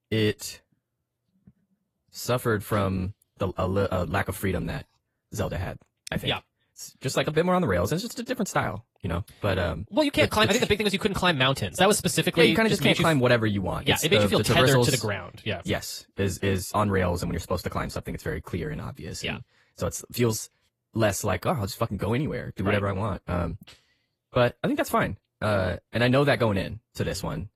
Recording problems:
wrong speed, natural pitch; too fast; 1.6 times normal speed
garbled, watery; slightly; nothing above 13 kHz

